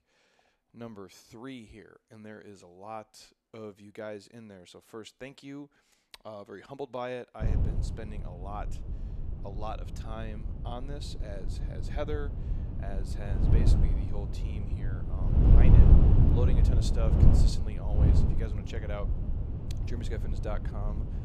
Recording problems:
wind noise on the microphone; heavy; from 7.5 s on; 2 dB above the speech

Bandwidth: 14.5 kHz